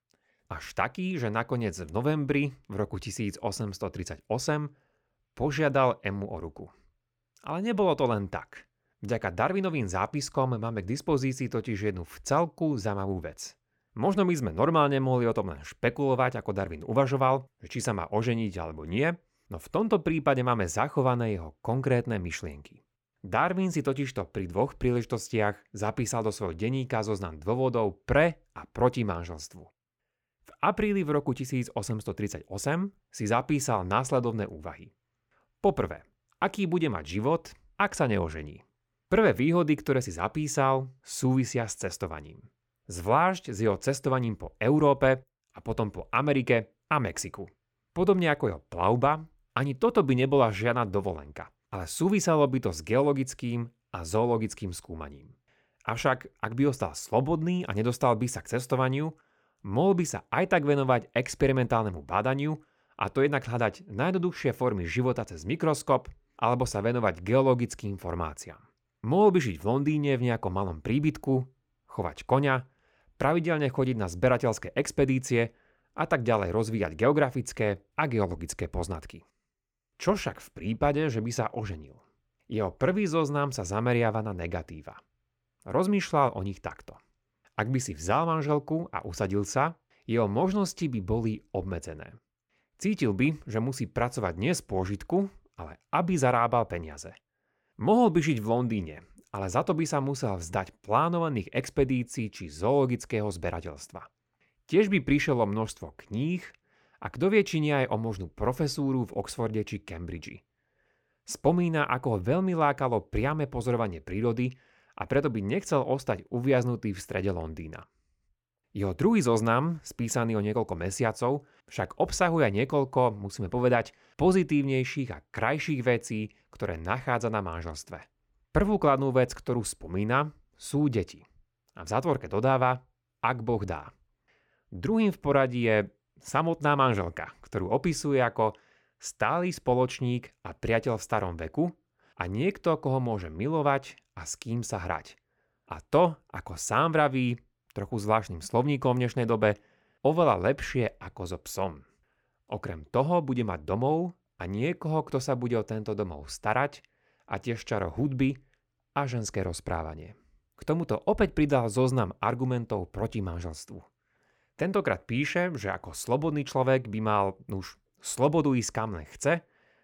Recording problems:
none

